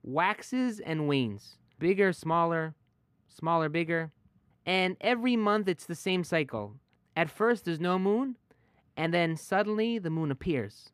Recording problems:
muffled; slightly; fading above 4 kHz

